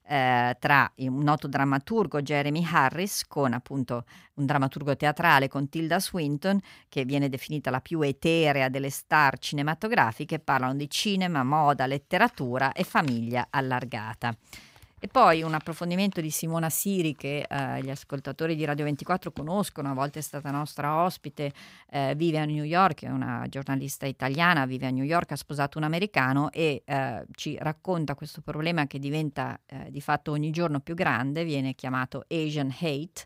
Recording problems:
none

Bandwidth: 15.5 kHz